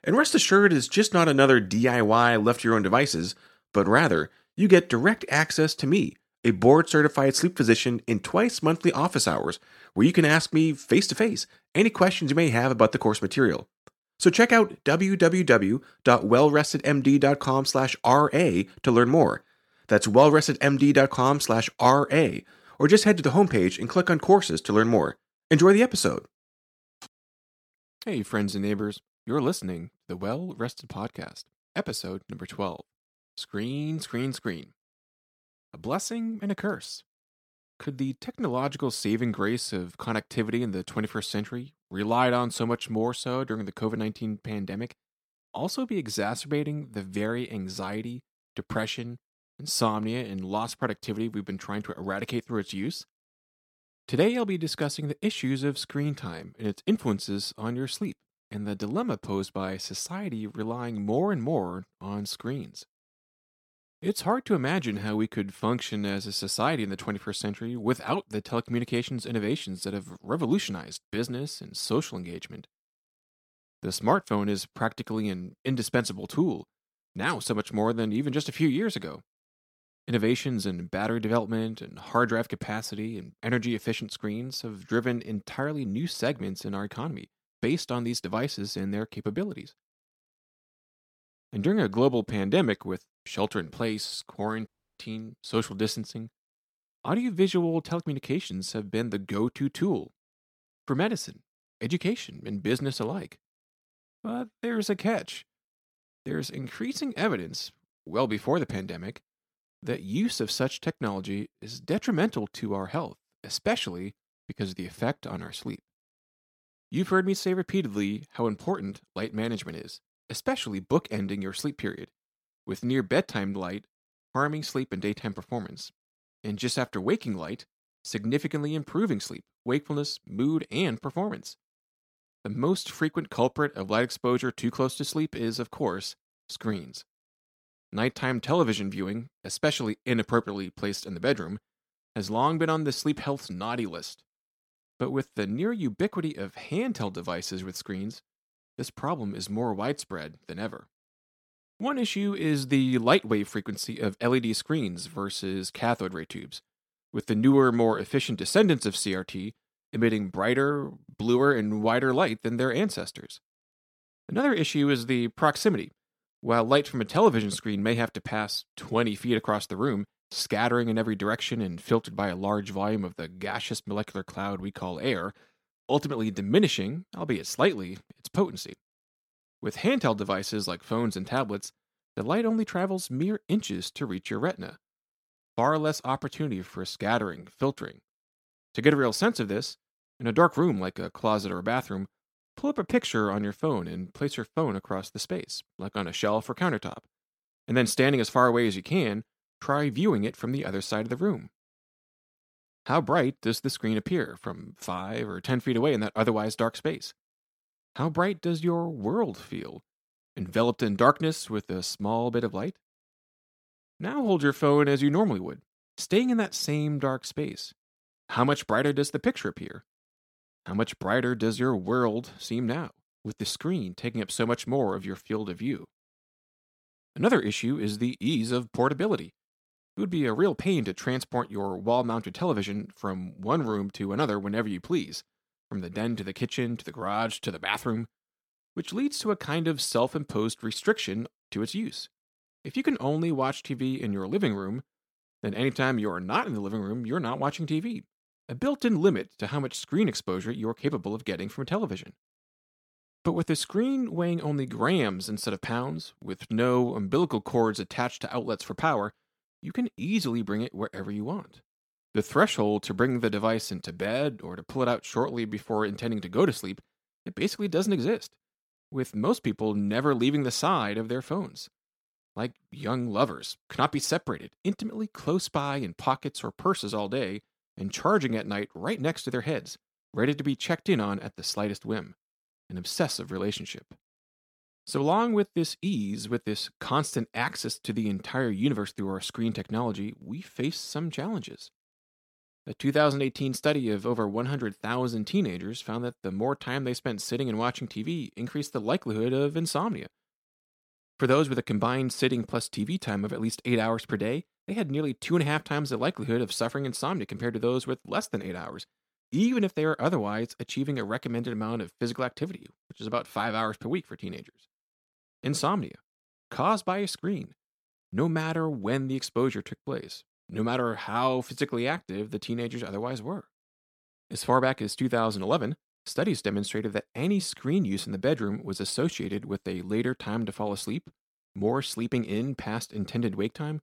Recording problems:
audio cutting out; at 1:35

